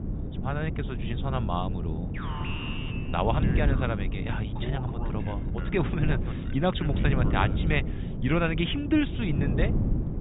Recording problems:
high frequencies cut off; severe; nothing above 4 kHz
wind noise on the microphone; heavy; 8 dB below the speech
alarm; noticeable; from 2 to 7.5 s; peak 6 dB below the speech

